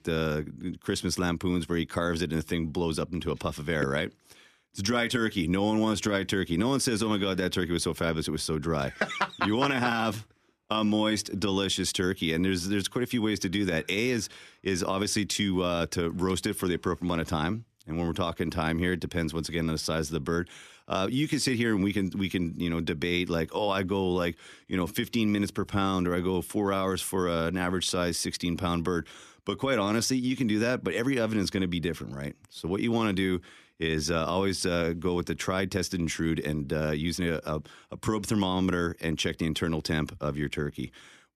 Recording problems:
none

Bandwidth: 14 kHz